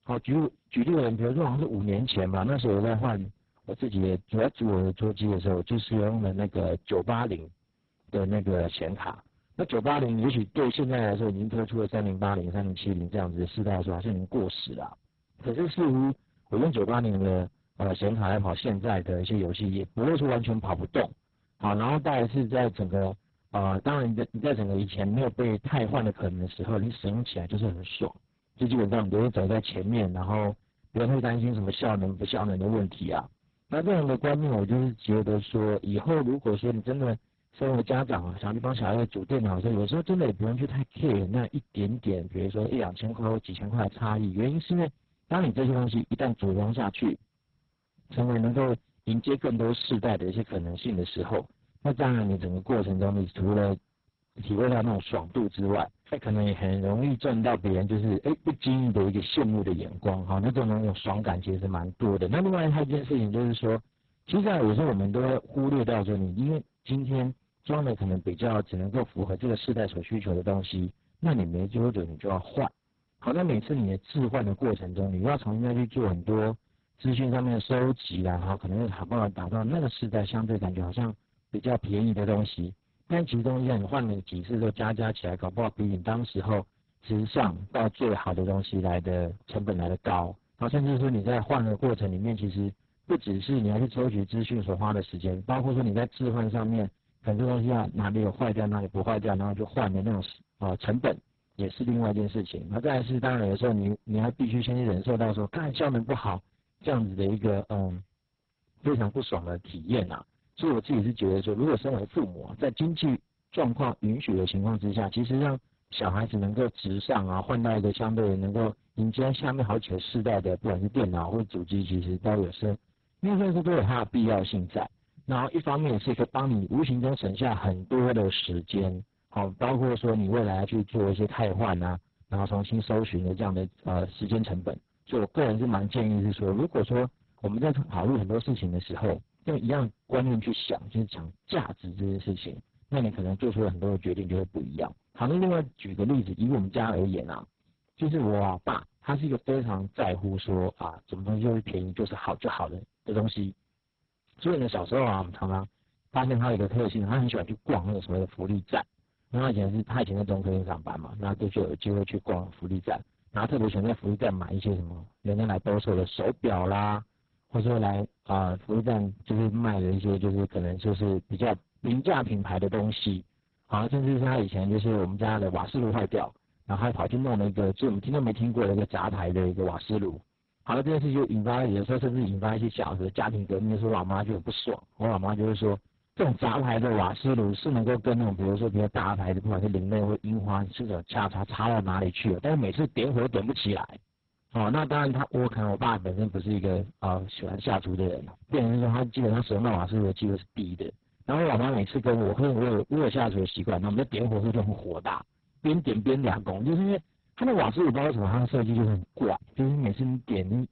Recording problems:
distortion; heavy; 12% of the sound clipped
garbled, watery; badly; nothing above 4 kHz

